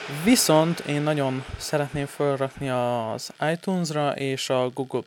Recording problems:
household noises; noticeable; throughout; 15 dB below the speech

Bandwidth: 18 kHz